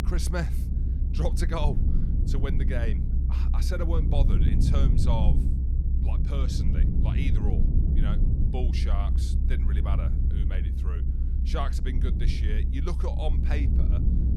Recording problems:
low rumble; loud; throughout; 4 dB below the speech

